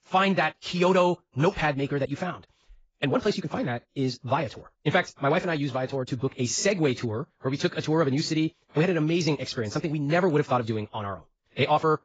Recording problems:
garbled, watery; badly; nothing above 7.5 kHz
wrong speed, natural pitch; too fast; 1.6 times normal speed

